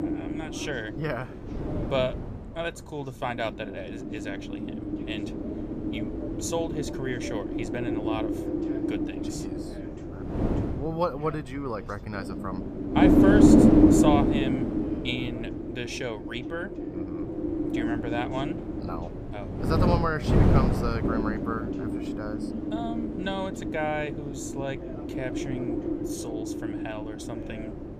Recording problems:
wind noise on the microphone; heavy; 2 dB above the speech
voice in the background; noticeable; throughout; 15 dB below the speech

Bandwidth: 14.5 kHz